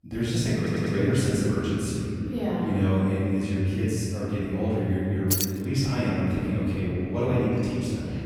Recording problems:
room echo; strong; dies away in 2.8 s
off-mic speech; far
audio stuttering; at 0.5 s
jangling keys; loud; at 5.5 s; peak level with the speech

